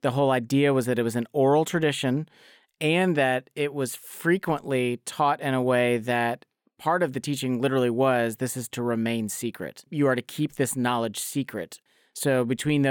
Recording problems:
abrupt cut into speech; at the end

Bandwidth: 17.5 kHz